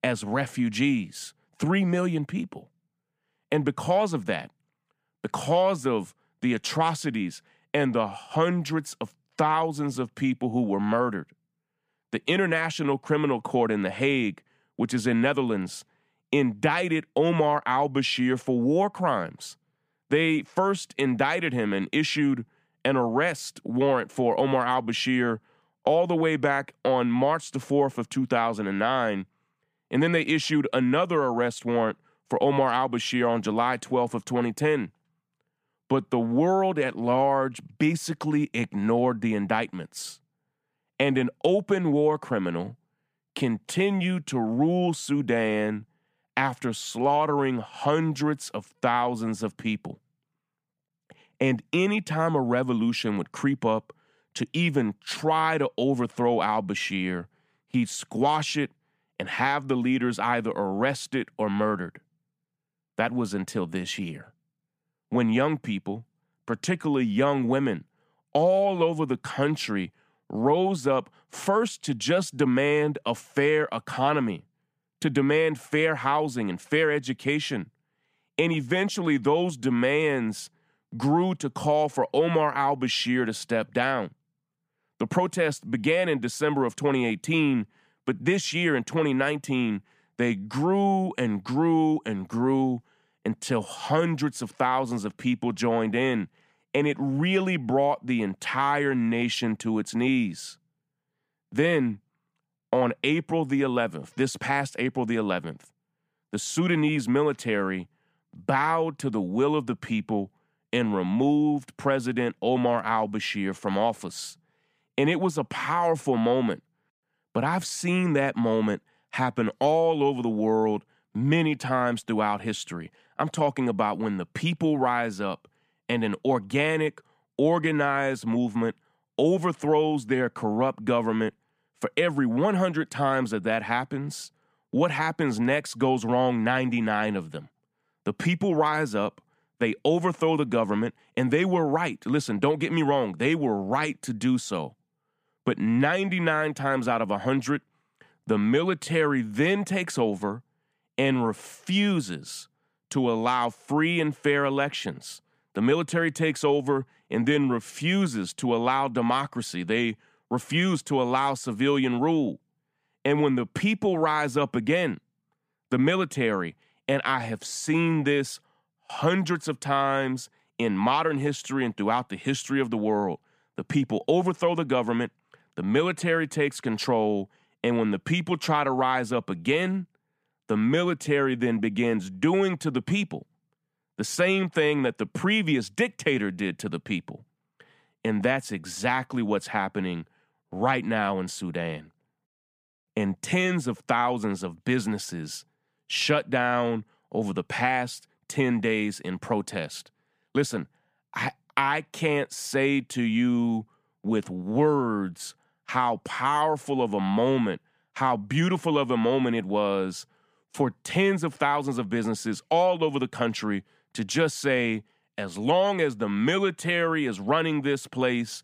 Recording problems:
none

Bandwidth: 15 kHz